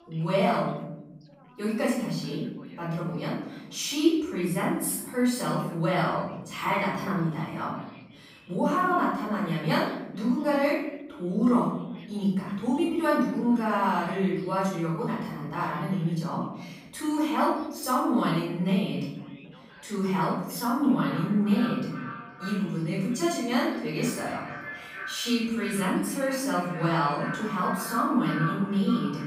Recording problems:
echo of what is said; strong; from 21 s on; 460 ms later, 10 dB below the speech
off-mic speech; far
room echo; noticeable; dies away in 1 s
background chatter; faint; throughout; 4 voices, 25 dB below the speech

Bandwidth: 15.5 kHz